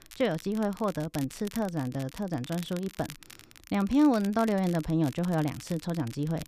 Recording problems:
crackle, like an old record; noticeable; 20 dB below the speech

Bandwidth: 14.5 kHz